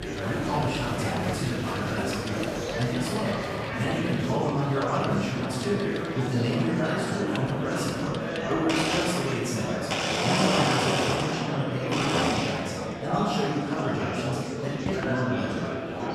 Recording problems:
room echo; strong; dies away in 1.3 s
off-mic speech; far
household noises; loud; throughout; as loud as the speech
murmuring crowd; loud; throughout; 2 dB below the speech

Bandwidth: 14.5 kHz